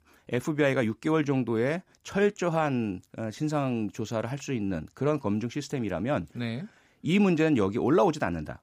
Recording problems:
none

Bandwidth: 15 kHz